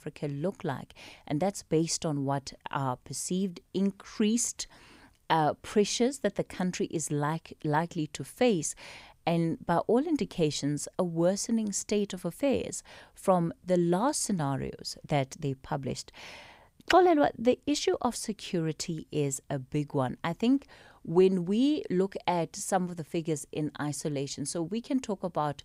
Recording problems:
none

